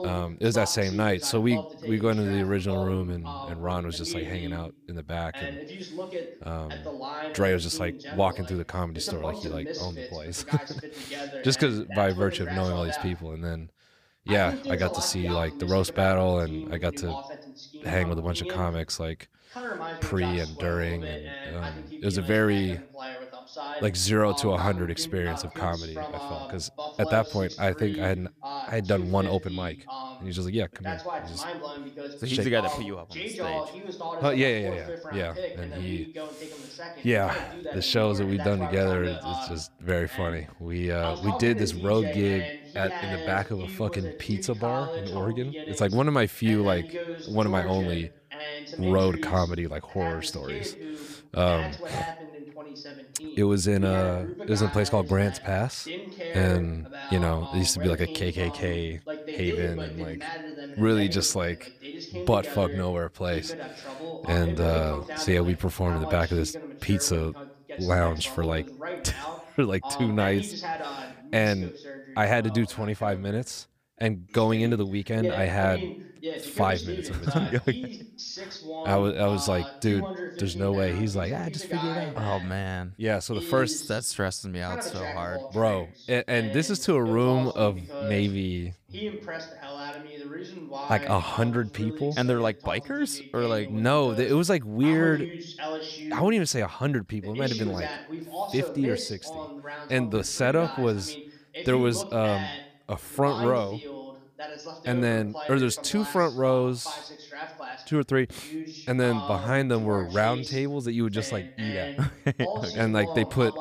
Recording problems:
voice in the background; loud; throughout; 10 dB below the speech

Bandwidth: 15 kHz